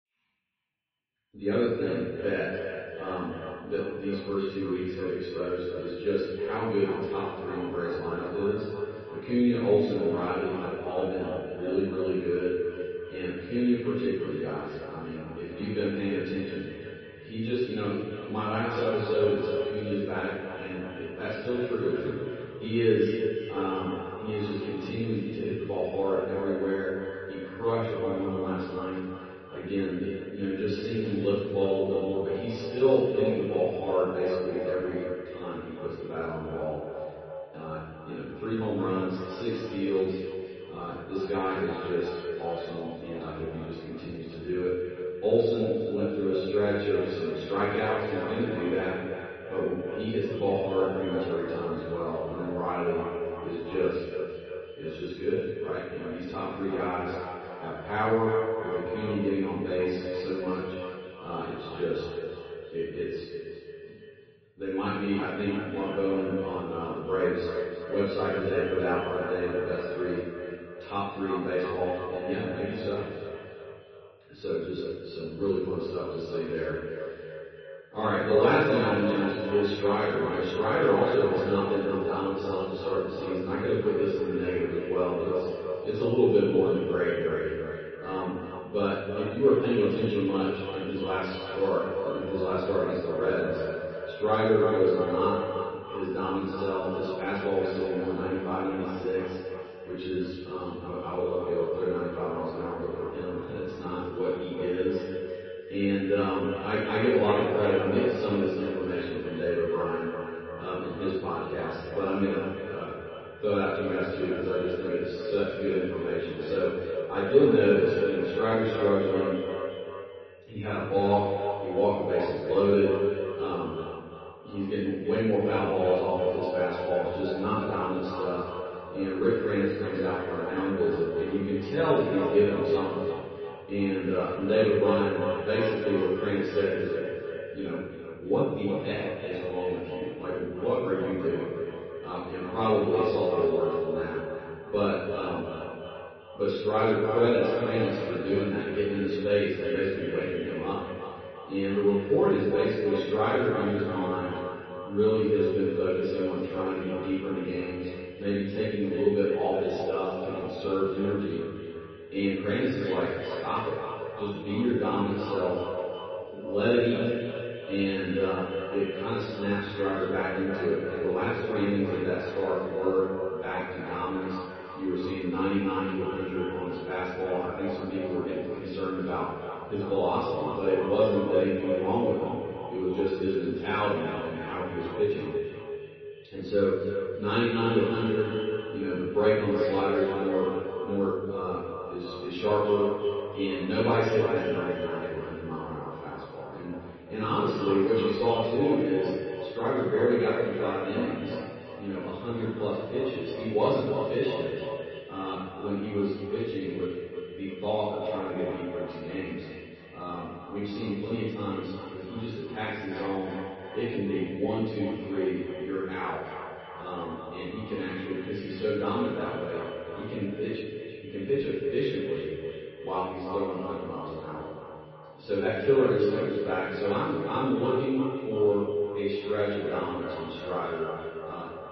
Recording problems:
echo of what is said; strong; throughout; 340 ms later, 6 dB below the speech
room echo; strong; dies away in 1.1 s
off-mic speech; far
garbled, watery; slightly; nothing above 5.5 kHz
muffled; very slightly; fading above 3 kHz

